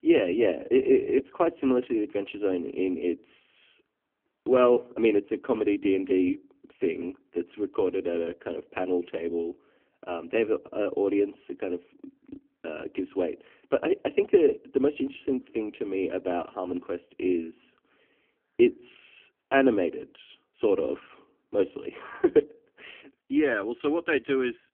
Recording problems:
phone-call audio; poor line

